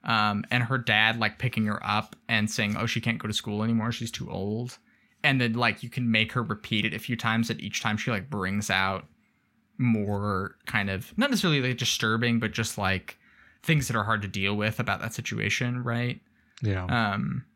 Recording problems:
none

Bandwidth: 16 kHz